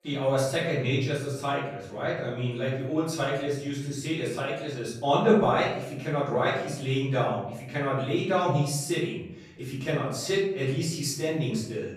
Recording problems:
off-mic speech; far
room echo; noticeable; dies away in 0.8 s

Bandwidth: 14.5 kHz